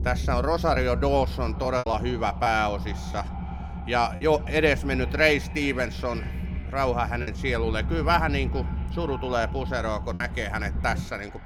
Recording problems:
echo of what is said; faint; throughout; 430 ms later, 20 dB below the speech
low rumble; noticeable; throughout; 20 dB below the speech
choppy; occasionally; 3% of the speech affected

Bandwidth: 18 kHz